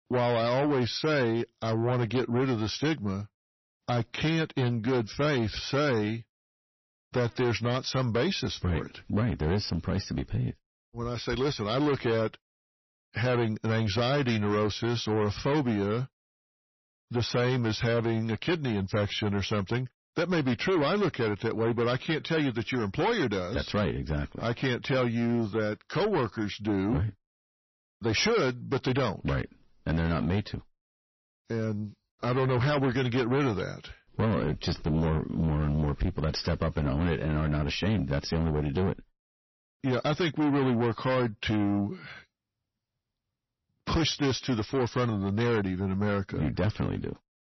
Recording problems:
distortion; heavy; 8 dB below the speech
garbled, watery; slightly; nothing above 6 kHz

